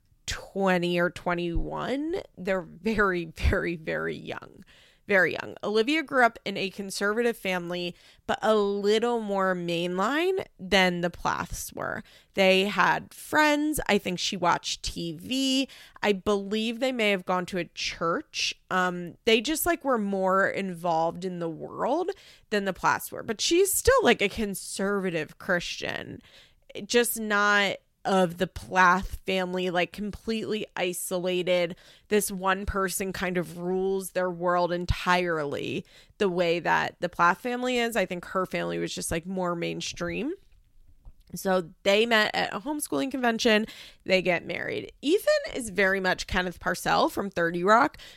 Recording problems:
none

